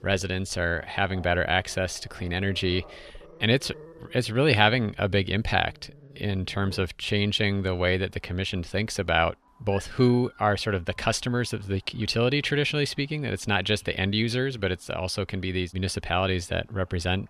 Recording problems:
animal sounds; faint; throughout; 25 dB below the speech

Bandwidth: 13.5 kHz